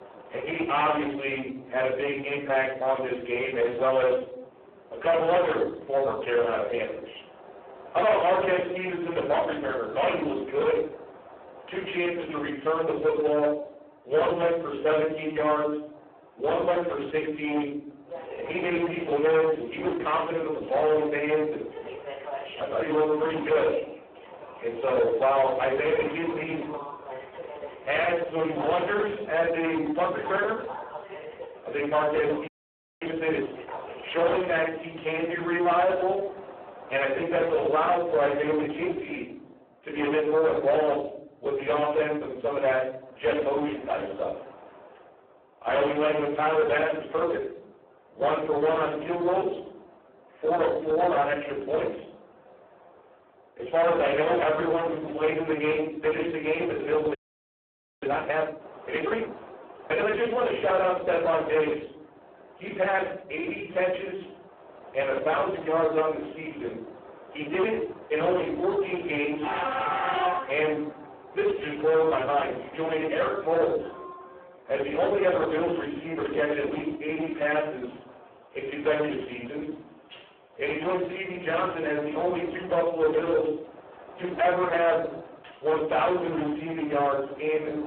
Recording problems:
phone-call audio; poor line
distortion; heavy; 14% of the sound clipped
off-mic speech; far
room echo; slight; dies away in 0.7 s
train or aircraft noise; noticeable; throughout; 15 dB below the speech
audio freezing; at 32 s for 0.5 s and at 57 s for 1 s

